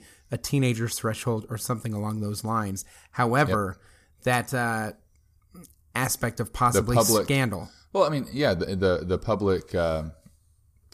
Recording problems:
none

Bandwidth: 14.5 kHz